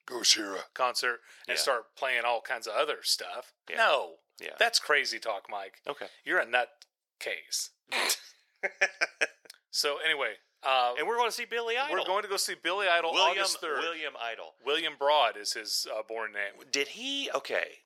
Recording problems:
thin; very; fading below 500 Hz

